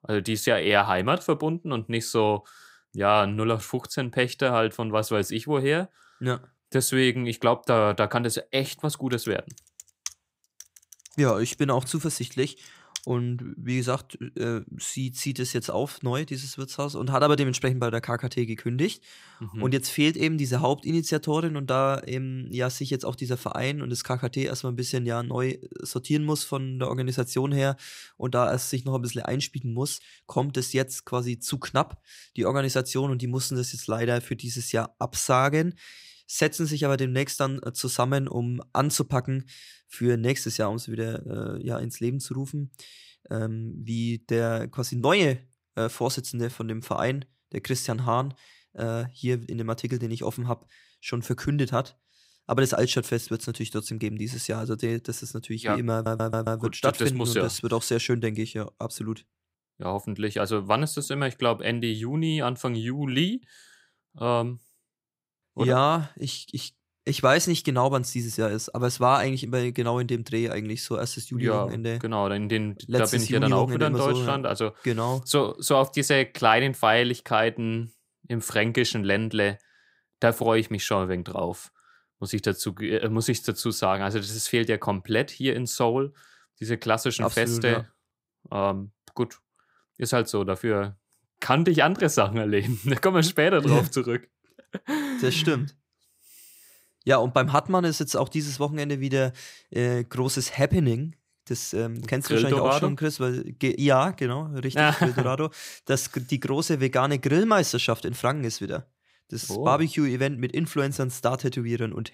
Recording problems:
keyboard typing; faint; from 9 to 13 s; peak 10 dB below the speech
audio stuttering; at 56 s

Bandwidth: 15.5 kHz